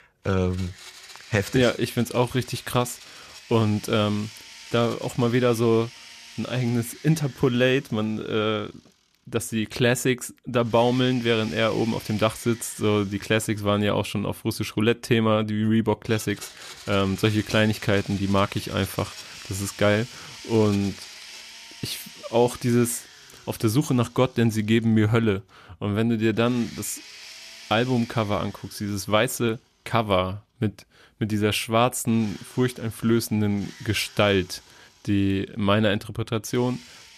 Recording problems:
household noises; noticeable; throughout; 20 dB below the speech

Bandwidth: 14.5 kHz